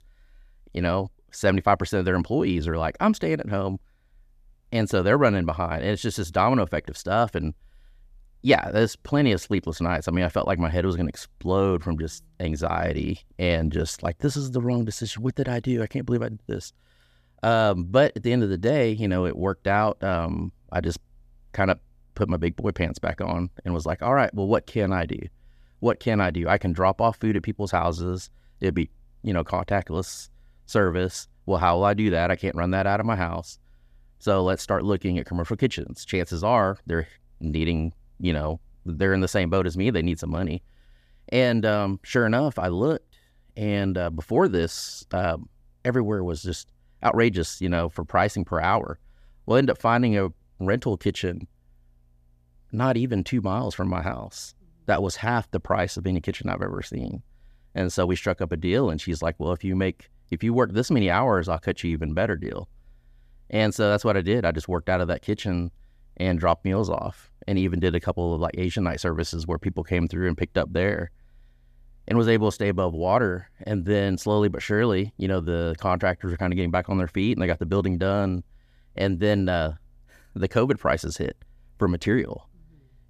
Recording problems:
none

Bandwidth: 14.5 kHz